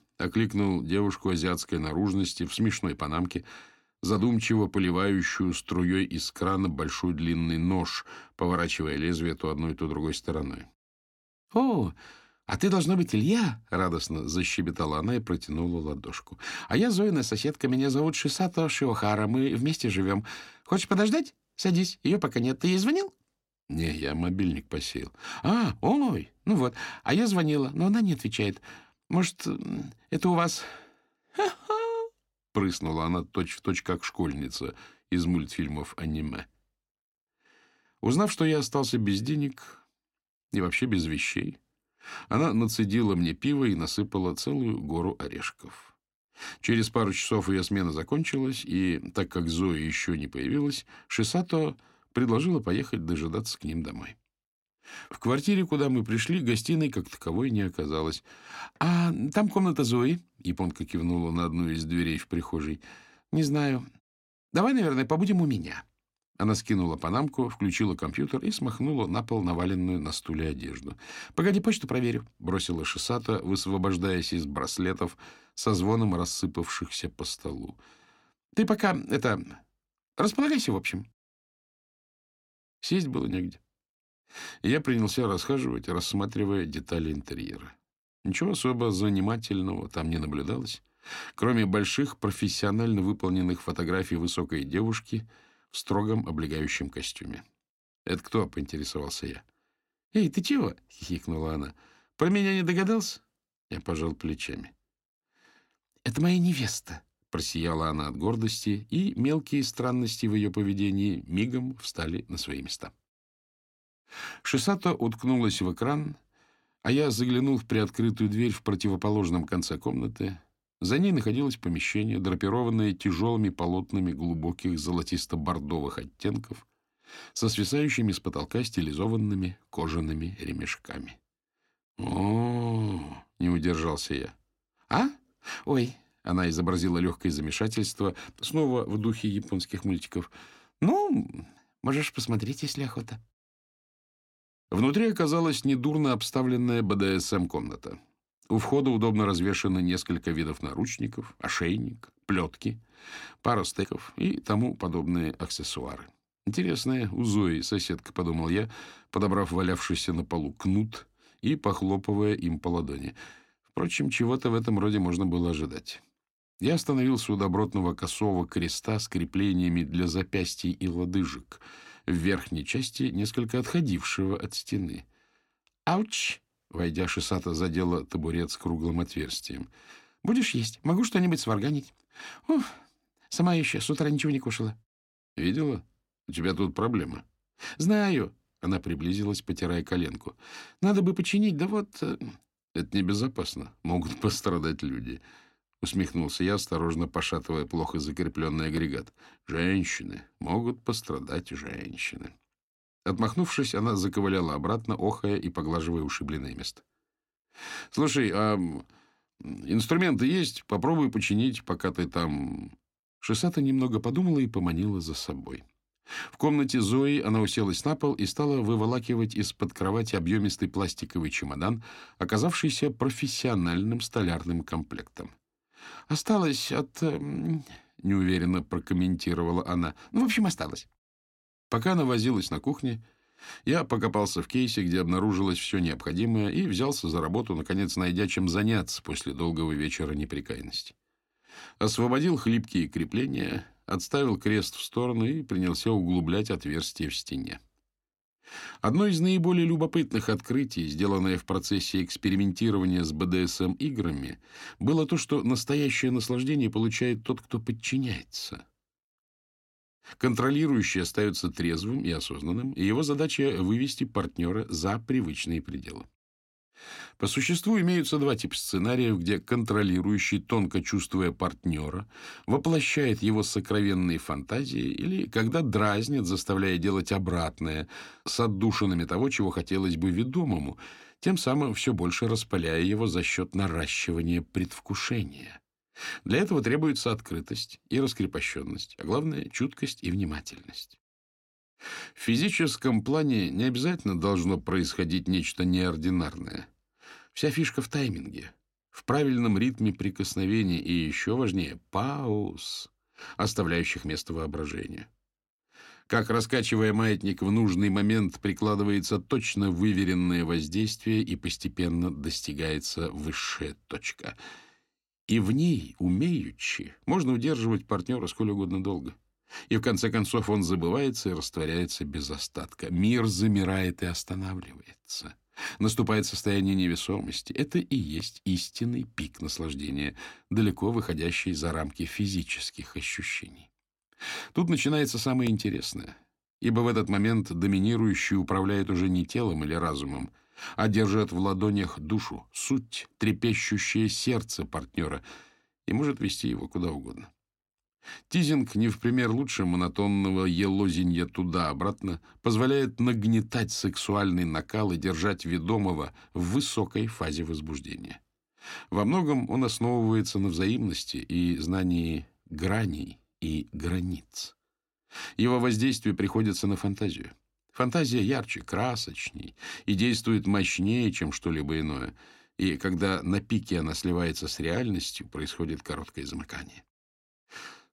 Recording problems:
none

